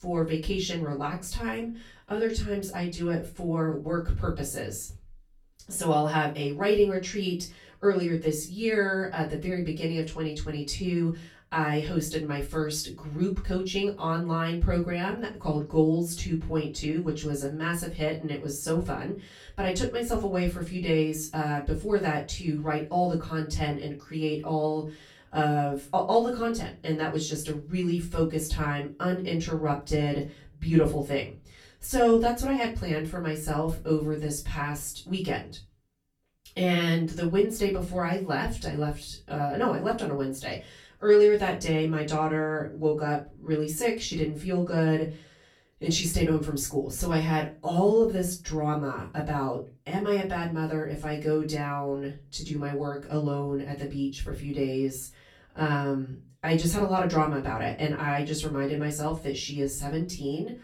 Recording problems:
off-mic speech; far
room echo; slight; dies away in 0.2 s

